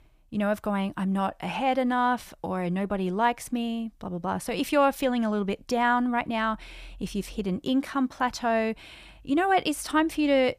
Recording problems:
none

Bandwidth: 15 kHz